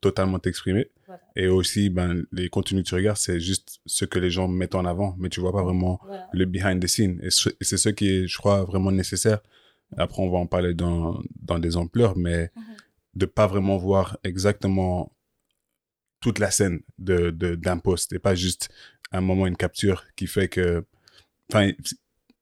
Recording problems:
none

